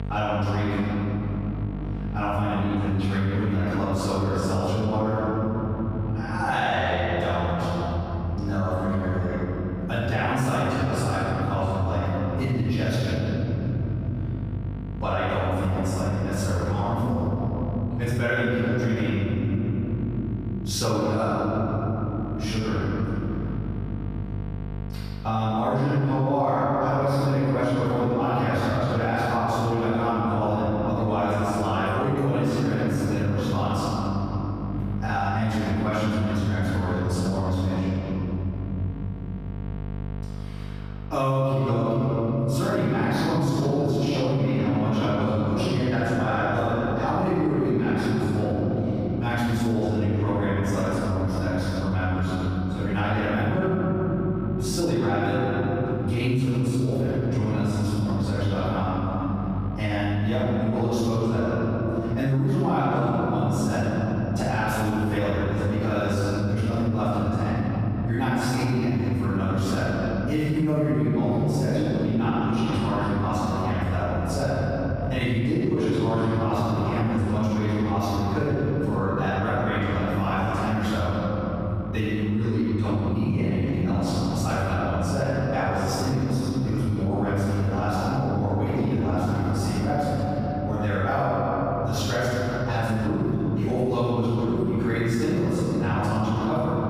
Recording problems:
room echo; strong; dies away in 3 s
off-mic speech; far
squashed, flat; somewhat
electrical hum; faint; throughout; 50 Hz, 20 dB below the speech

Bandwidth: 15 kHz